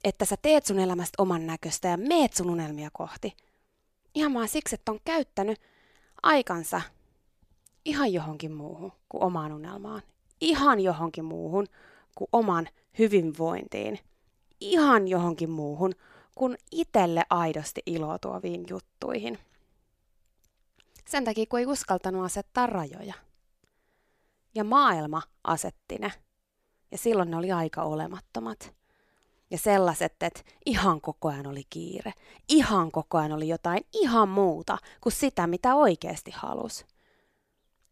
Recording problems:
none

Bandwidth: 14.5 kHz